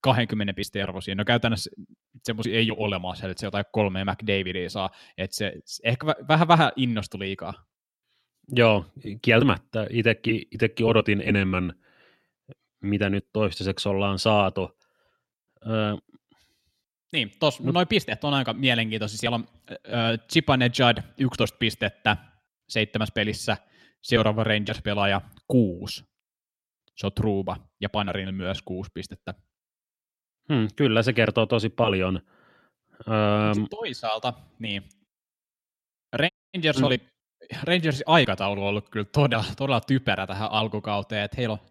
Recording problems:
audio cutting out; at 36 s

